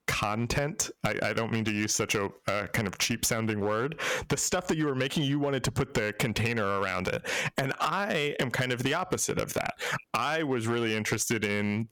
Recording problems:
distortion; heavy; 6% of the sound clipped
squashed, flat; heavily

